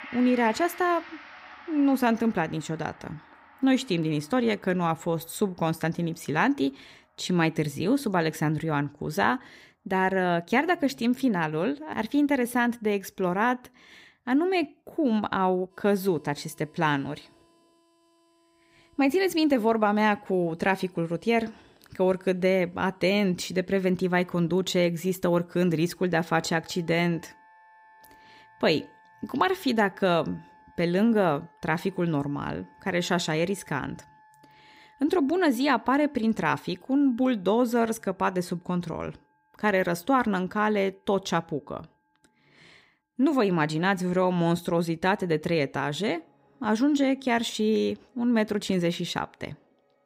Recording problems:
background music; faint; throughout; 25 dB below the speech

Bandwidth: 15.5 kHz